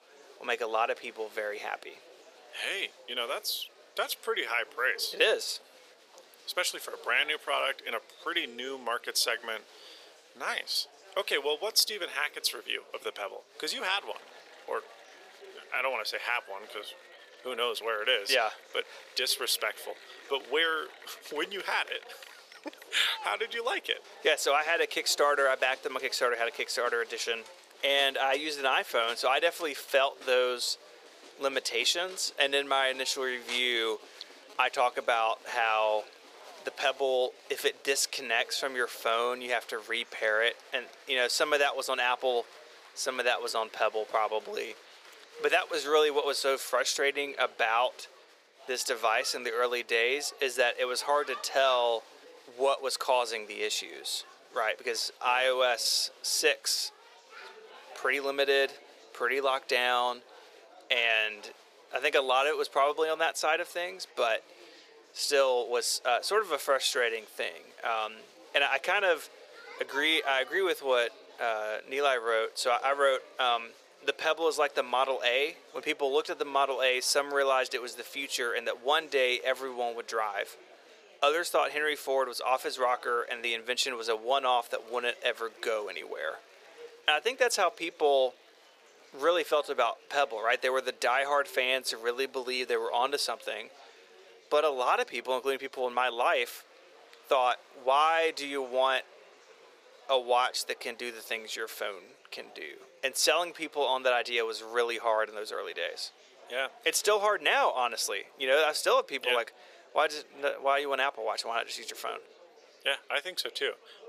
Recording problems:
thin; very; fading below 450 Hz
murmuring crowd; faint; throughout; 25 dB below the speech

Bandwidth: 15 kHz